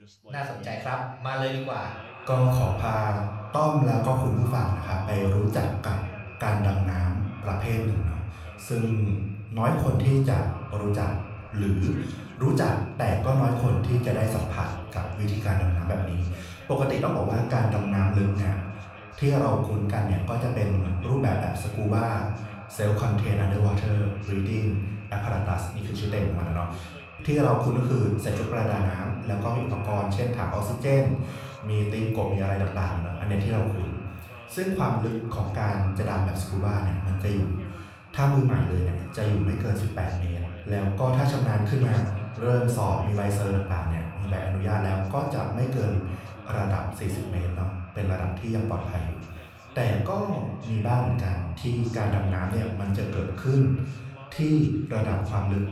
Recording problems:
room echo; noticeable; dies away in 0.7 s
echo of what is said; faint; throughout; 430 ms later, 20 dB below the speech
off-mic speech; somewhat distant
voice in the background; faint; throughout; 25 dB below the speech

